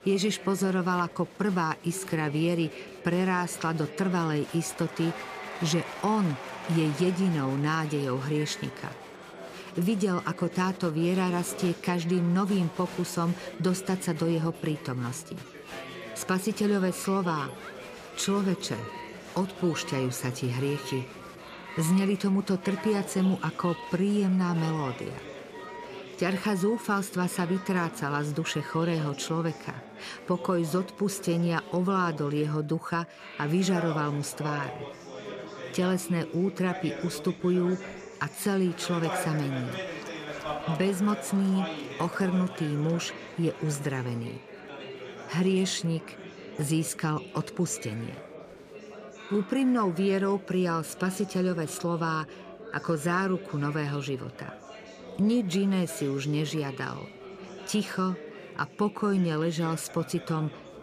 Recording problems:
alarms or sirens; noticeable; until 35 s; 20 dB below the speech
chatter from many people; noticeable; throughout; 10 dB below the speech

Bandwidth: 15 kHz